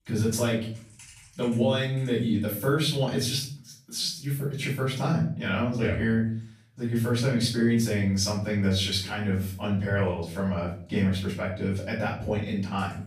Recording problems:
off-mic speech; far
room echo; noticeable; dies away in 0.4 s

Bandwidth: 14.5 kHz